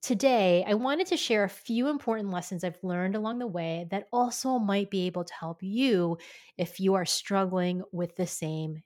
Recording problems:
uneven, jittery; slightly; from 2 to 7 s

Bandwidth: 17 kHz